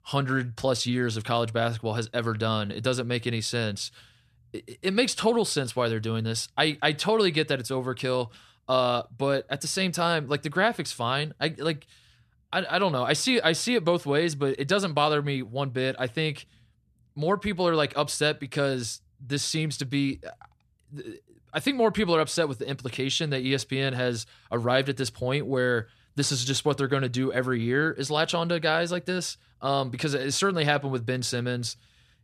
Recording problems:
none

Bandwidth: 14 kHz